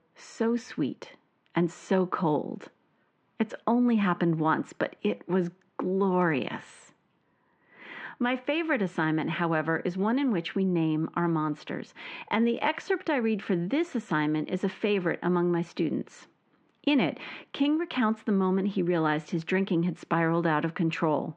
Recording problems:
muffled; very; fading above 3 kHz

